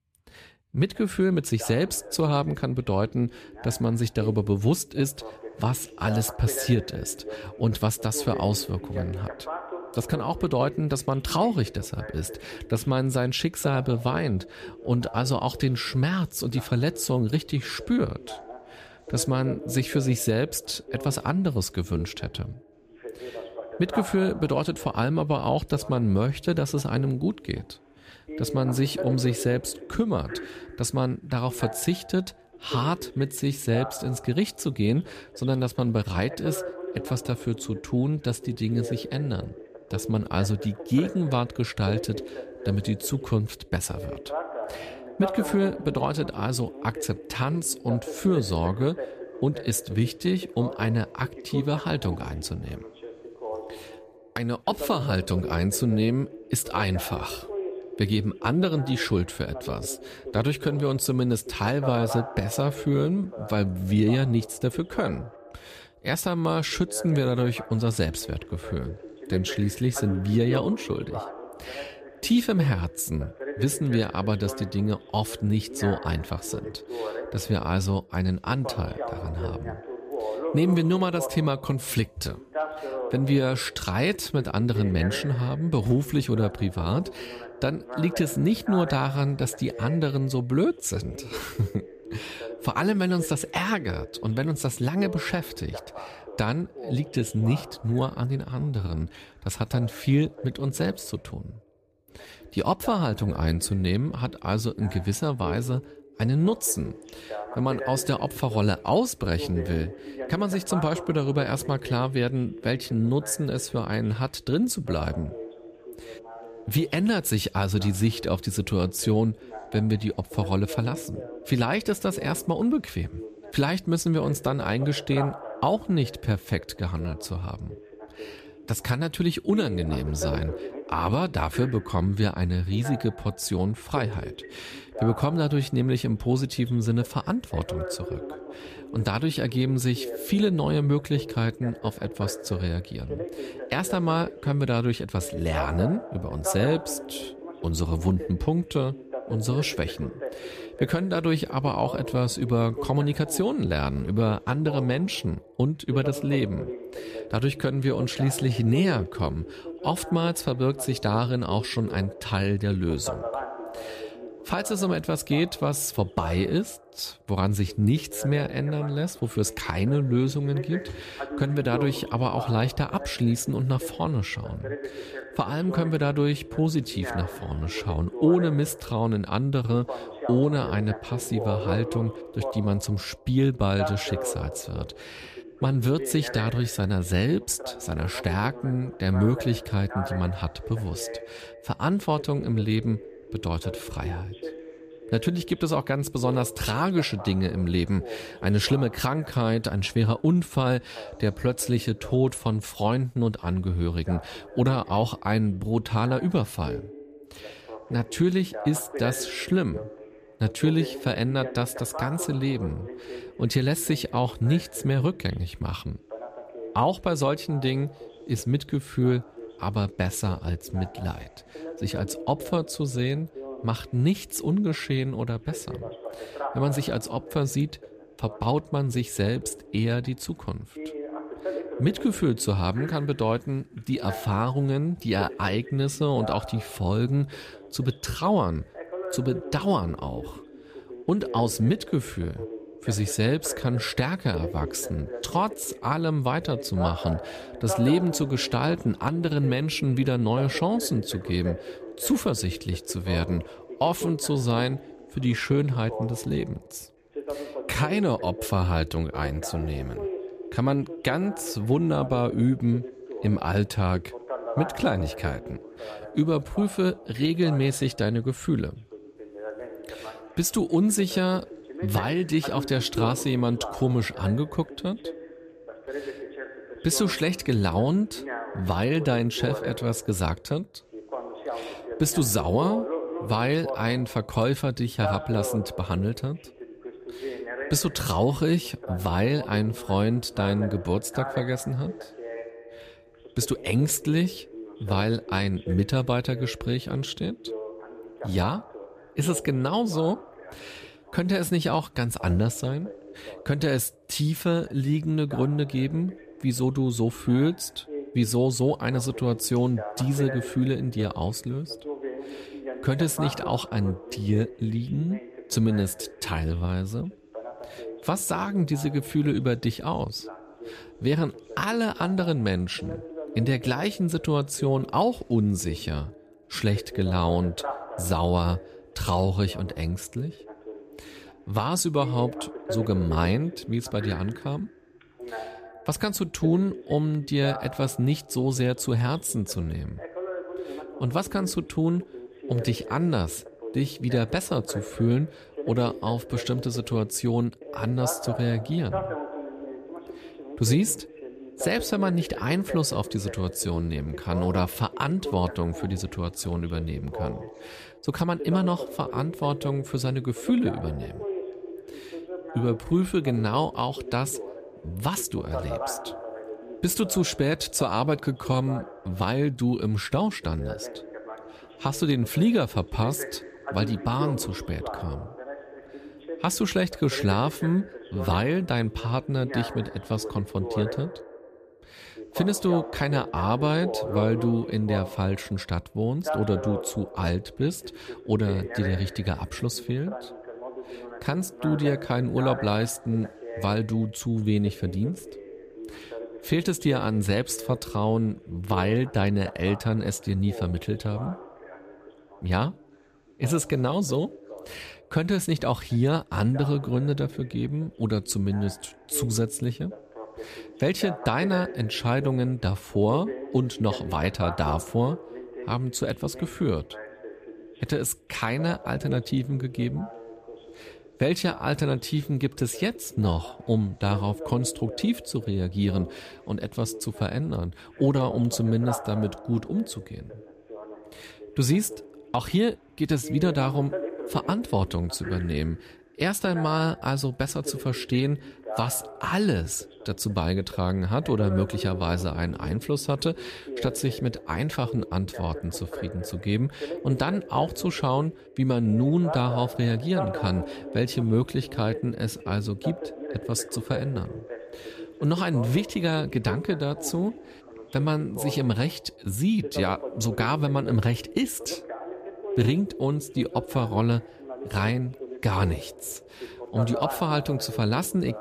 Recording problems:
voice in the background; noticeable; throughout; 10 dB below the speech

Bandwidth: 14.5 kHz